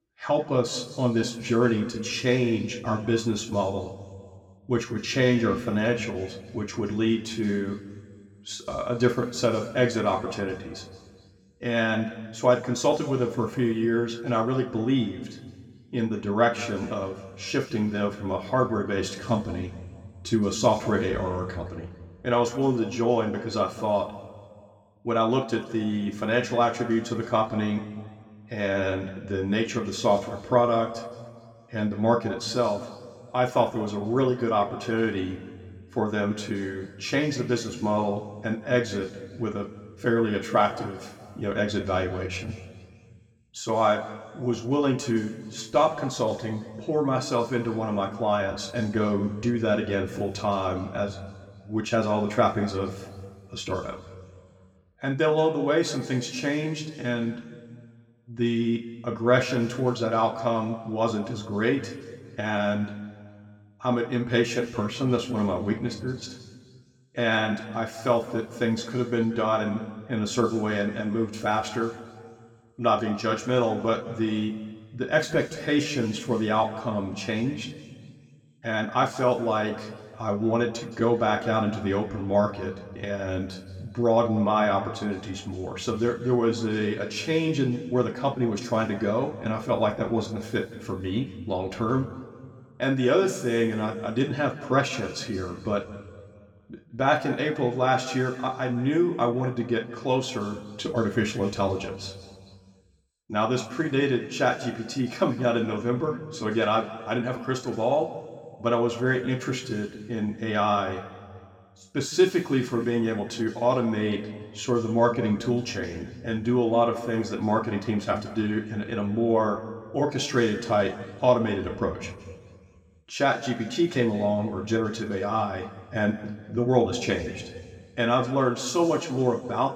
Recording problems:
room echo; noticeable; dies away in 1.6 s
off-mic speech; somewhat distant

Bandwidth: 17.5 kHz